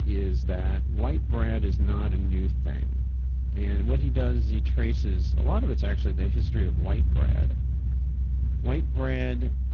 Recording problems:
garbled, watery; slightly; nothing above 6 kHz
low rumble; loud; throughout; 8 dB below the speech

